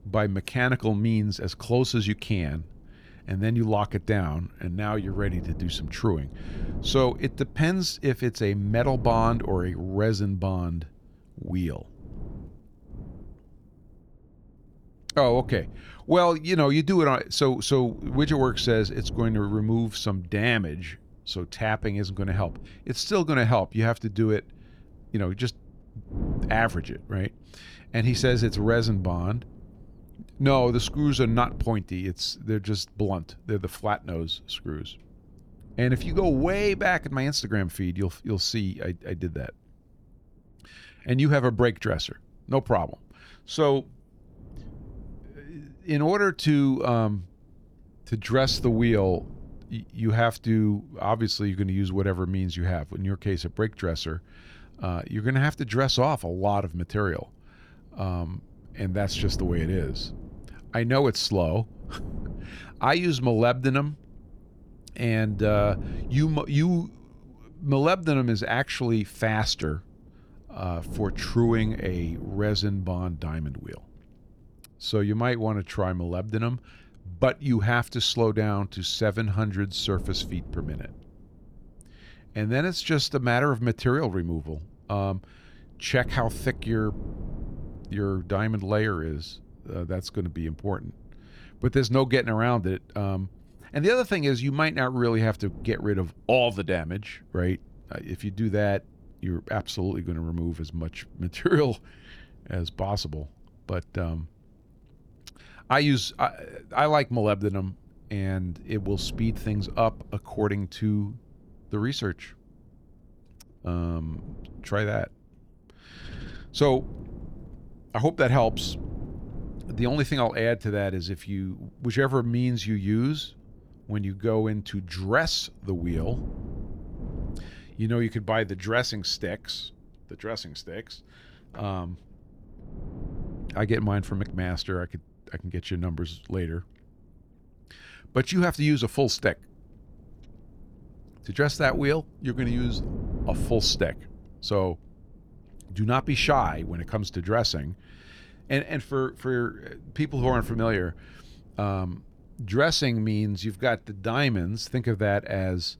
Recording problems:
wind noise on the microphone; occasional gusts; 20 dB below the speech

